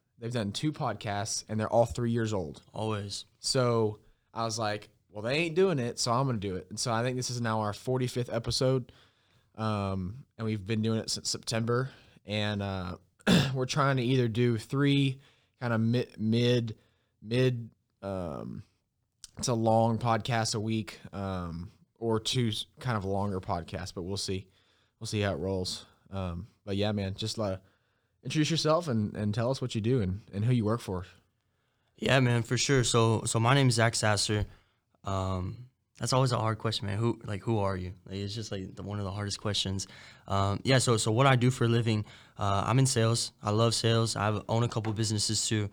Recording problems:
none

